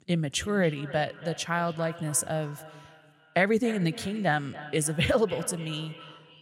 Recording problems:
echo of what is said; noticeable; throughout; 280 ms later, 15 dB below the speech

